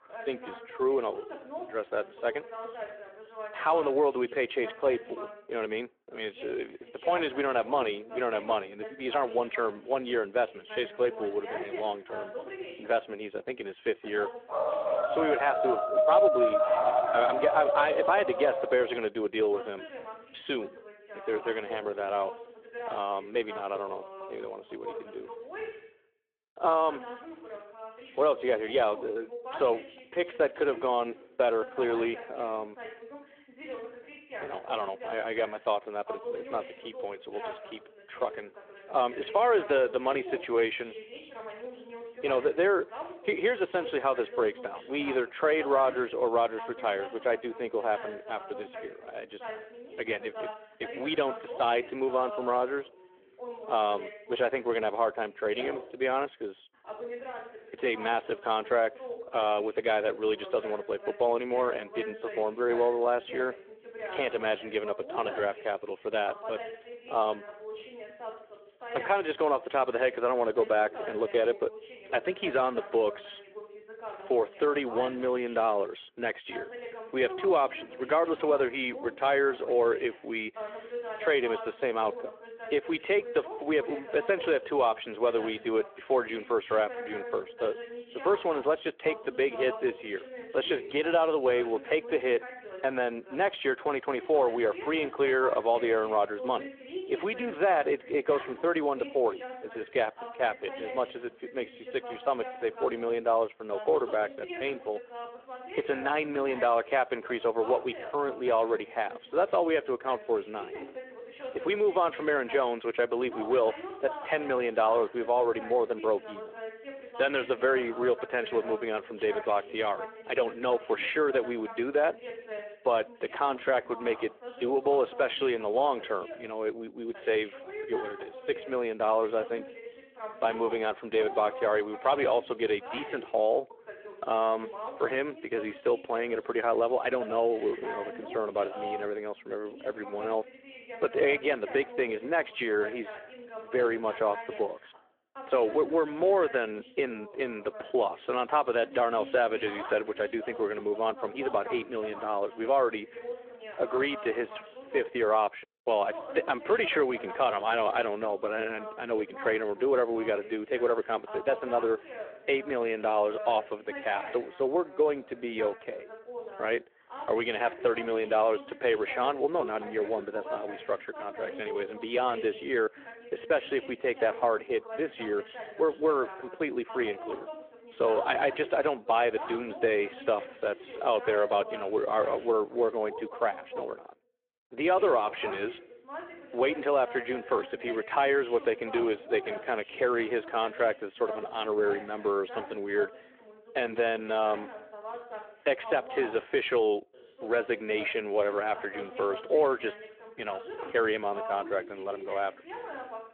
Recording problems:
phone-call audio
voice in the background; noticeable; throughout; 15 dB below the speech
dog barking; loud; from 15 to 19 s; peak 6 dB above the speech

